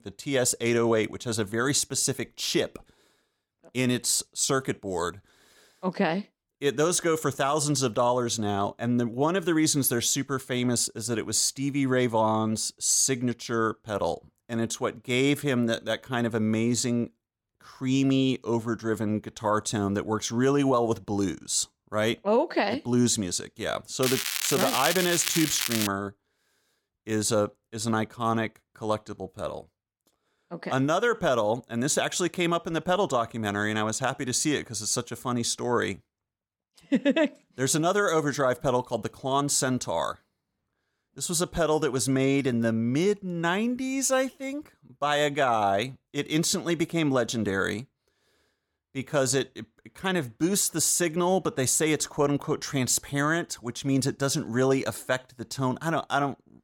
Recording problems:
crackling; loud; from 24 to 26 s; 2 dB below the speech

